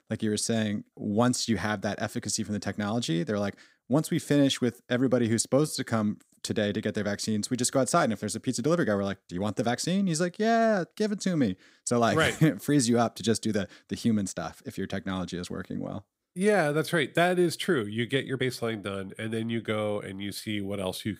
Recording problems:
uneven, jittery; slightly; from 5.5 to 18 s

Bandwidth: 15.5 kHz